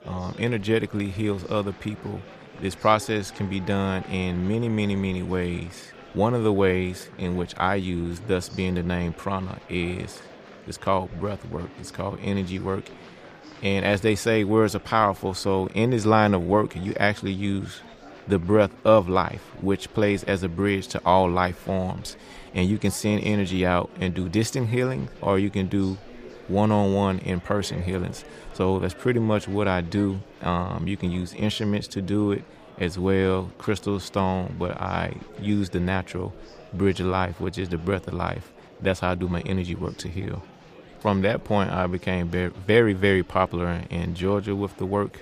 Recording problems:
murmuring crowd; faint; throughout; 20 dB below the speech

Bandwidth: 15 kHz